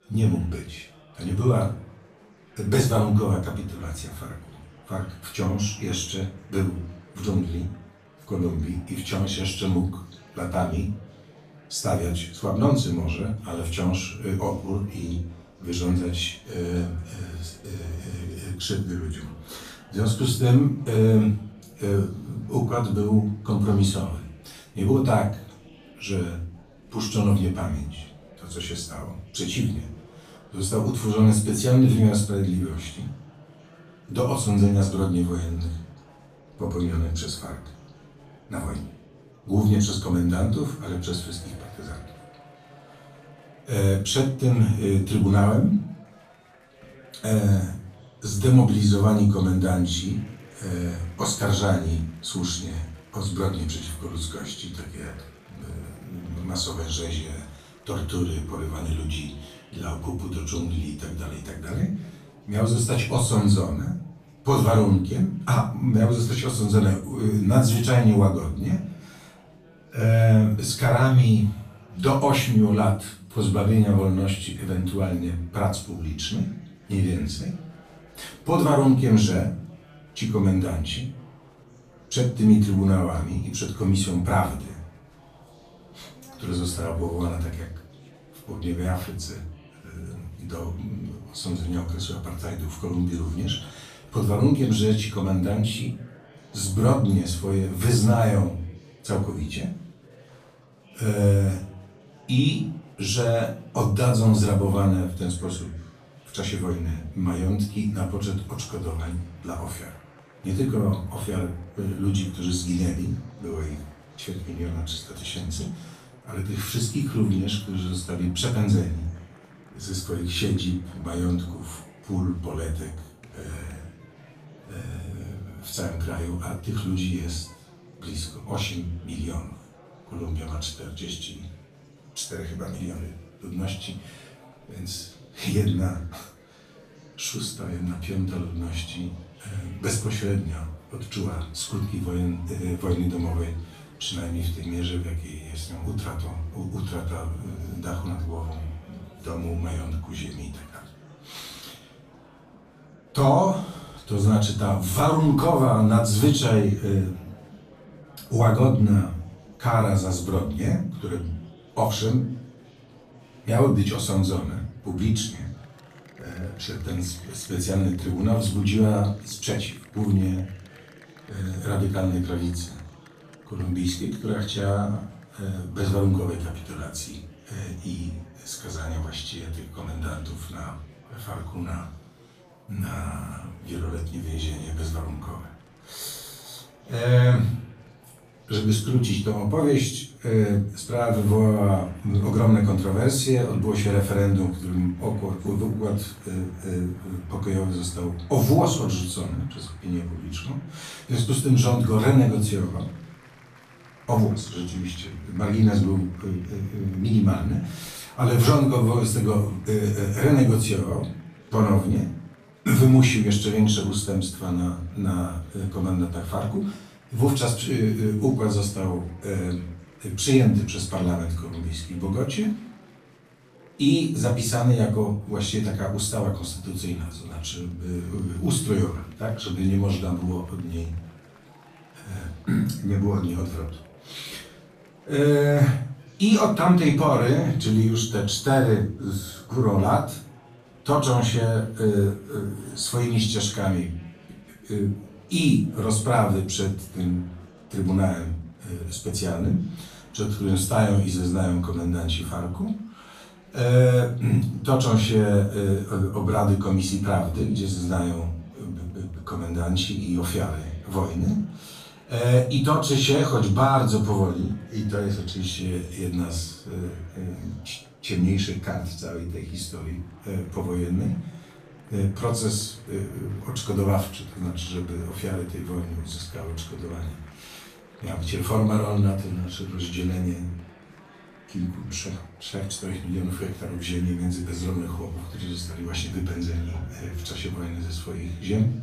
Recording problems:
off-mic speech; far
room echo; noticeable; dies away in 0.4 s
chatter from many people; faint; throughout; 25 dB below the speech

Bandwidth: 14.5 kHz